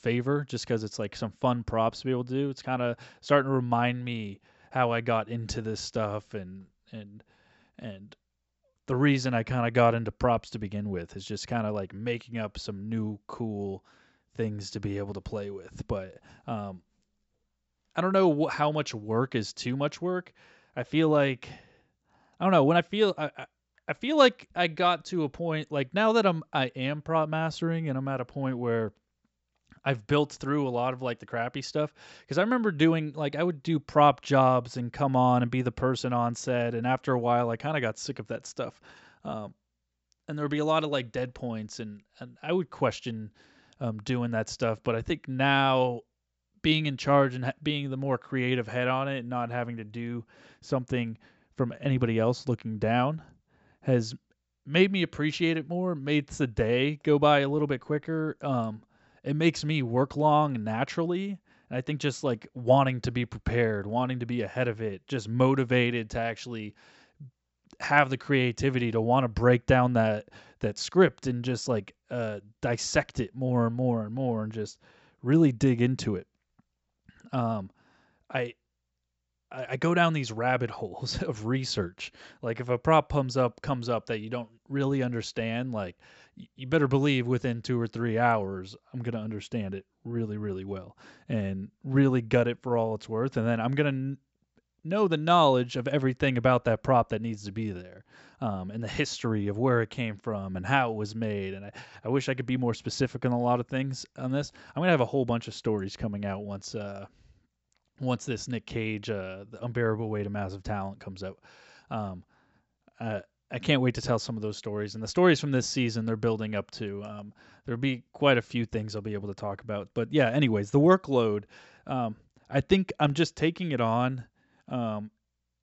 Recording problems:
high frequencies cut off; noticeable; nothing above 7.5 kHz

